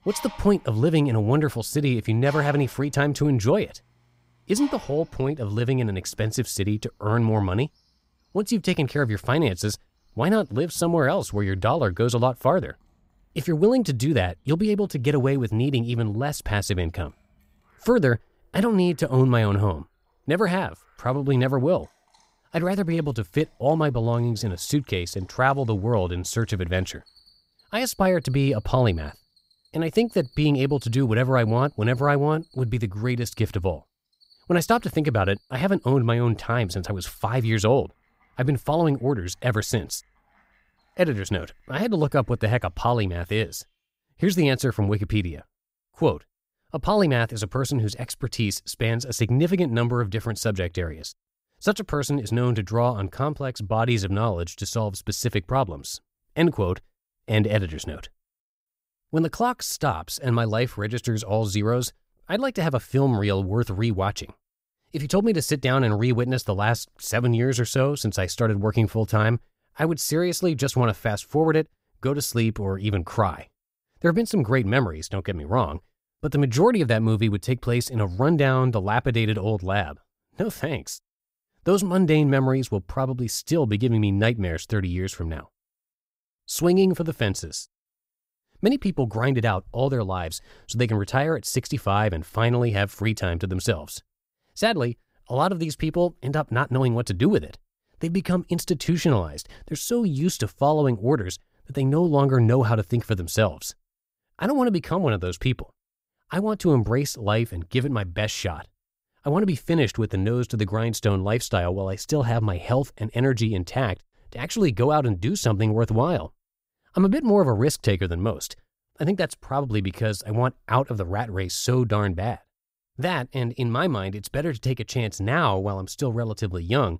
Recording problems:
animal sounds; faint; until 44 s; 30 dB below the speech

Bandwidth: 15.5 kHz